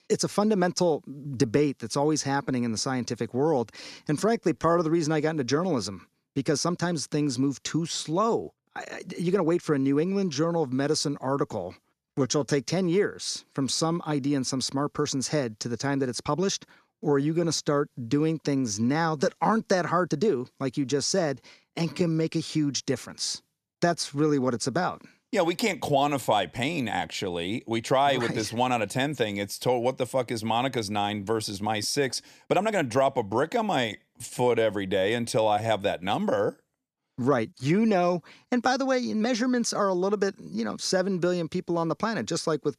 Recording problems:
uneven, jittery; strongly; from 3.5 to 39 s

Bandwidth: 14.5 kHz